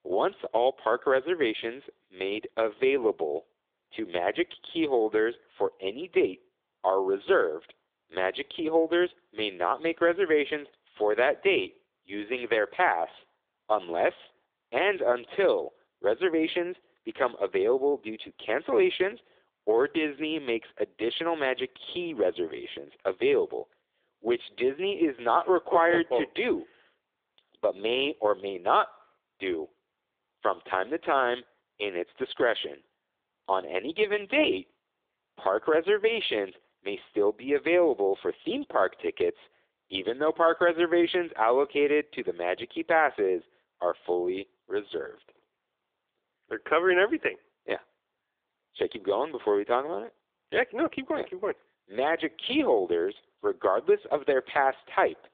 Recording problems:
phone-call audio

